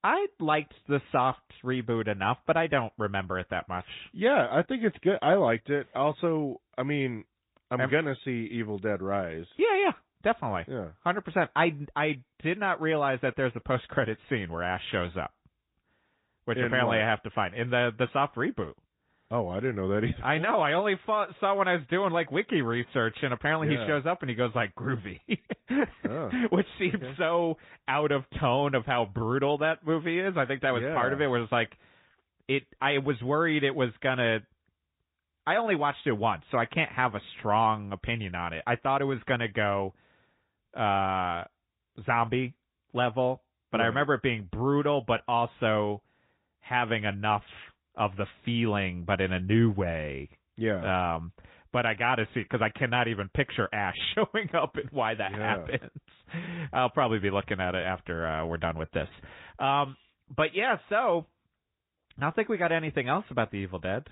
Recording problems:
high frequencies cut off; severe; nothing above 3.5 kHz
garbled, watery; slightly

